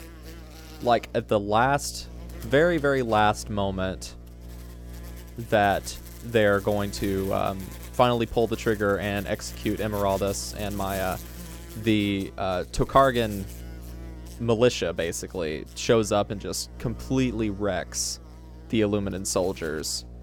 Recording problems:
electrical hum; faint; throughout; 60 Hz, 20 dB below the speech

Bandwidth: 17 kHz